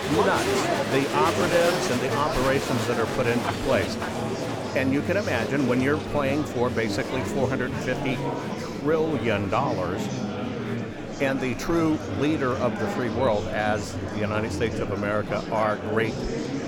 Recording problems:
murmuring crowd; loud; throughout; 2 dB below the speech

